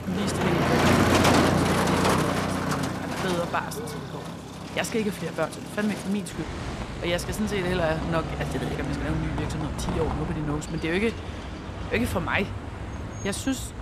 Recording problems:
traffic noise; very loud; throughout; 2 dB above the speech

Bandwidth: 14.5 kHz